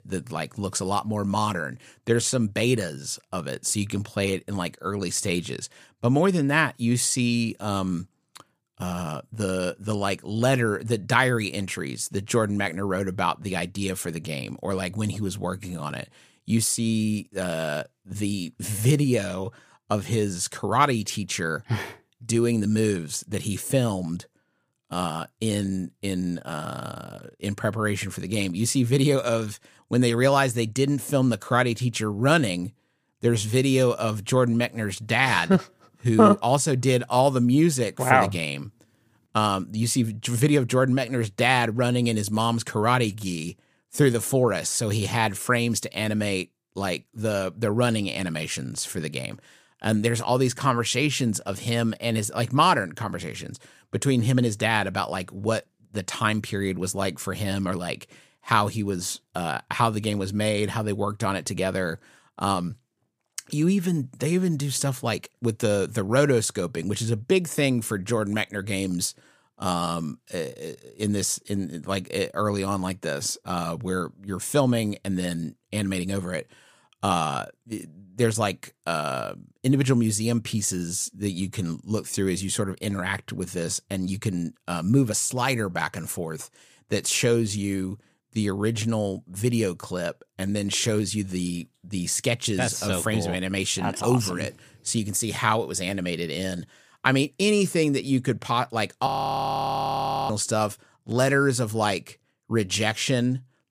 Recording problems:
audio freezing; at 1:39 for 1 s

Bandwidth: 15 kHz